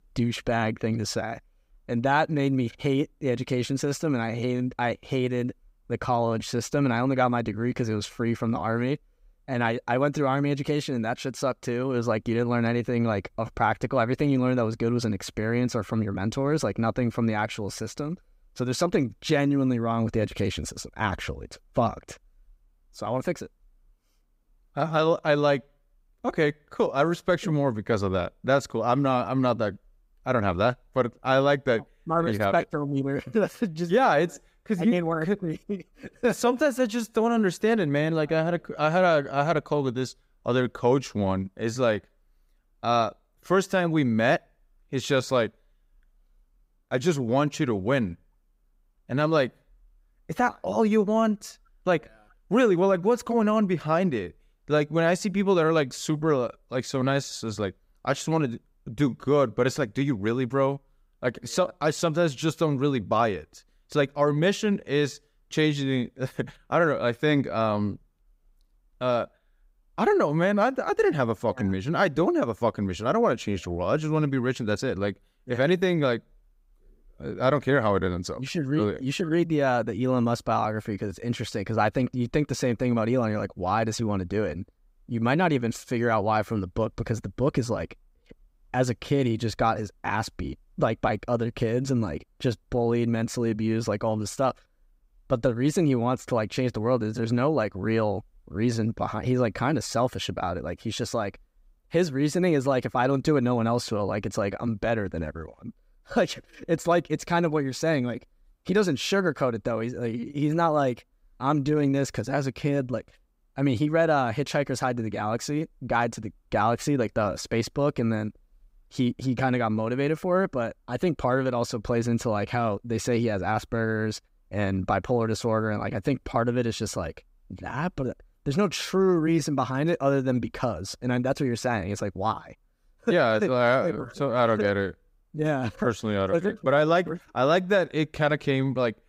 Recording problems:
none

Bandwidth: 15.5 kHz